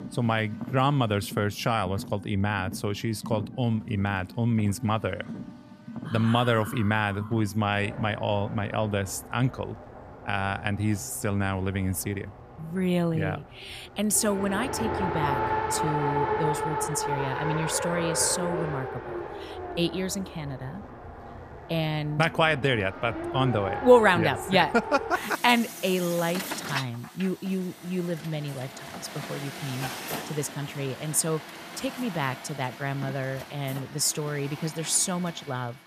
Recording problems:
traffic noise; loud; throughout; 8 dB below the speech

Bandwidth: 14.5 kHz